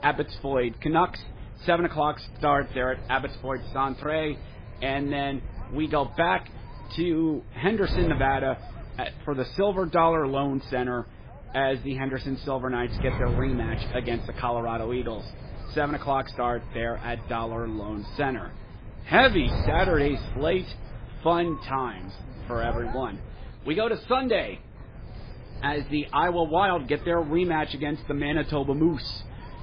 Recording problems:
garbled, watery; badly; nothing above 5 kHz
wind noise on the microphone; occasional gusts; 15 dB below the speech

